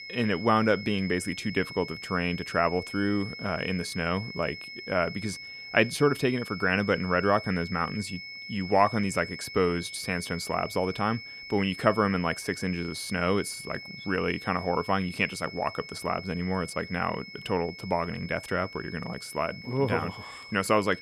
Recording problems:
high-pitched whine; noticeable; throughout; 2 kHz, 10 dB below the speech

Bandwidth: 14.5 kHz